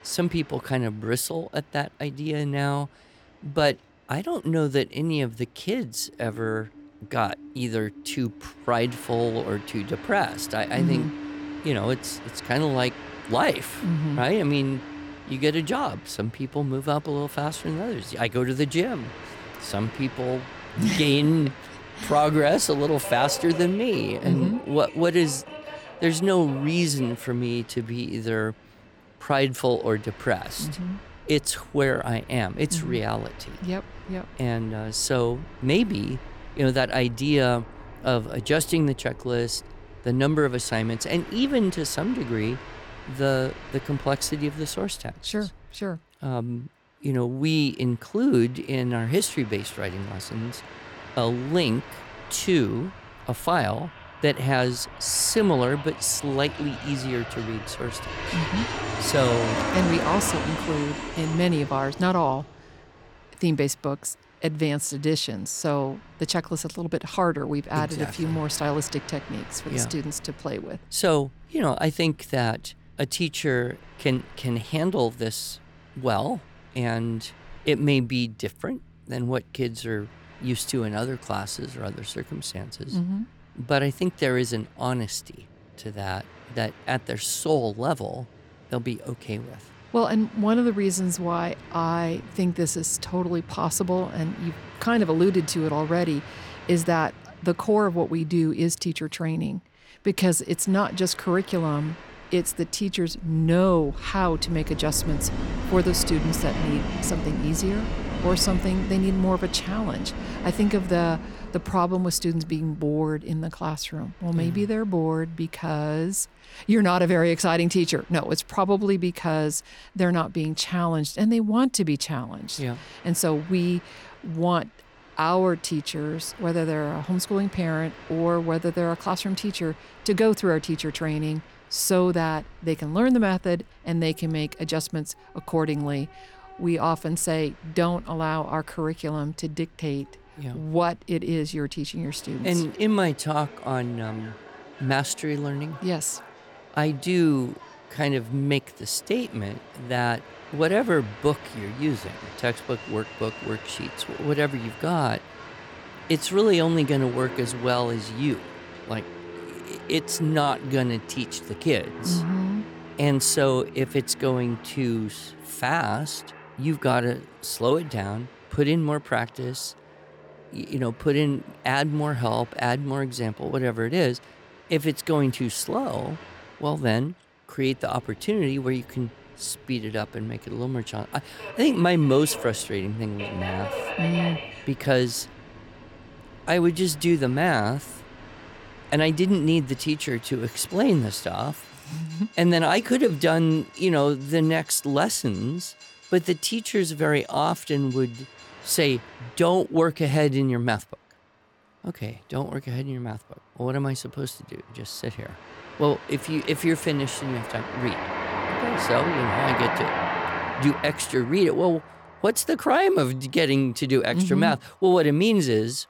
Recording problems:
train or aircraft noise; noticeable; throughout; 10 dB below the speech

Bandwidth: 17 kHz